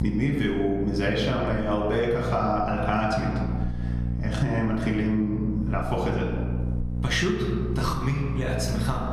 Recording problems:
off-mic speech; far
room echo; noticeable; dies away in 1 s
squashed, flat; somewhat
electrical hum; noticeable; throughout; 60 Hz, 15 dB below the speech

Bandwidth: 14 kHz